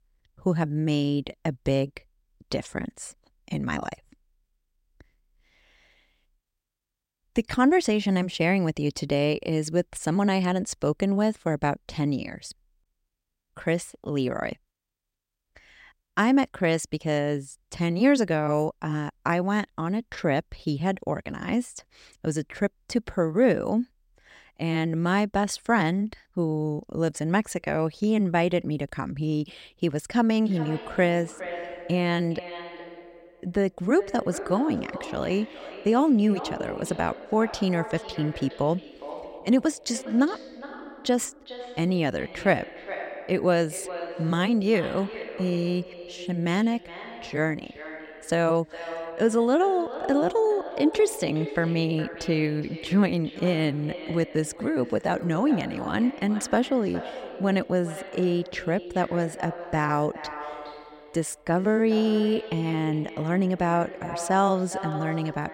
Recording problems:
echo of what is said; noticeable; from 30 s on; 410 ms later, 15 dB below the speech

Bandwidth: 16 kHz